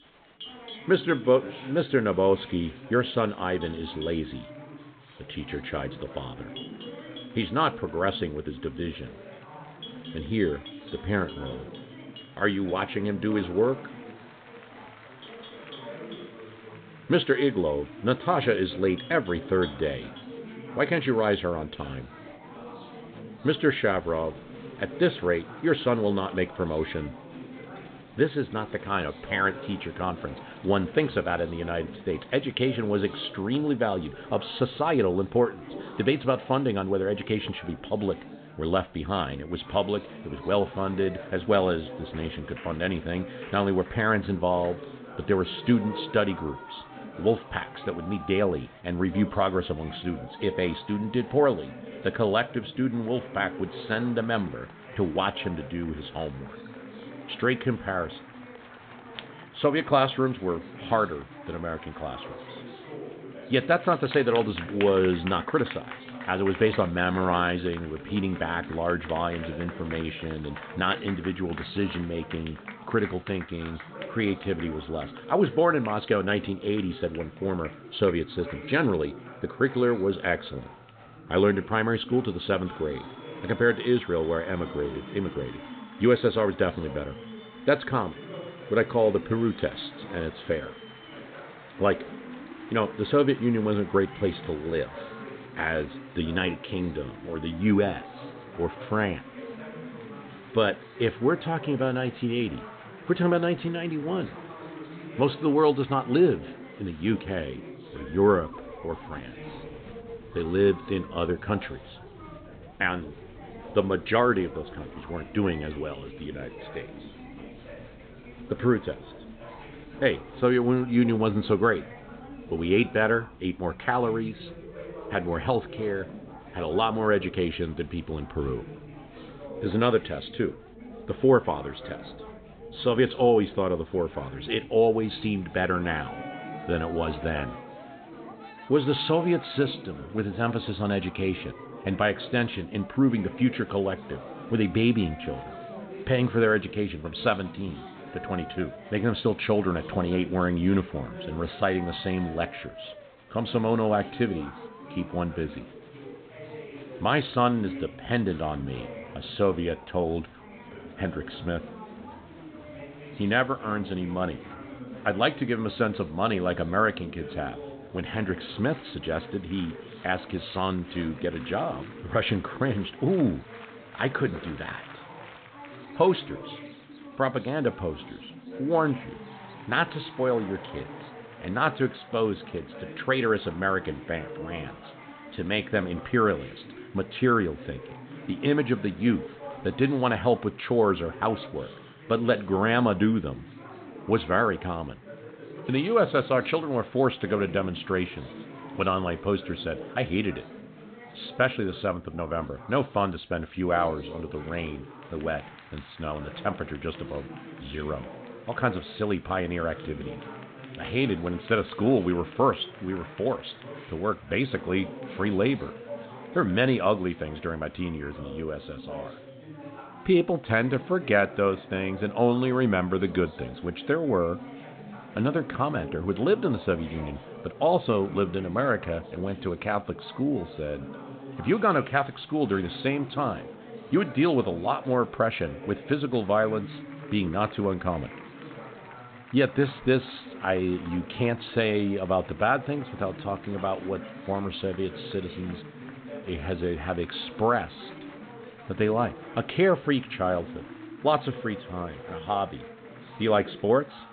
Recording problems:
high frequencies cut off; severe; nothing above 4 kHz
chatter from many people; noticeable; throughout; 15 dB below the speech
animal sounds; faint; throughout; 30 dB below the speech

